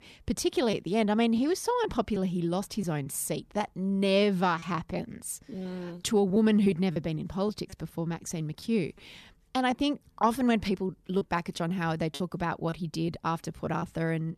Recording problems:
choppy; occasionally; 5% of the speech affected

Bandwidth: 14 kHz